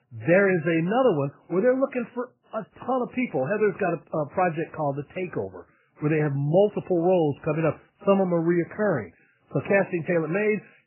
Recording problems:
garbled, watery; badly; nothing above 3 kHz

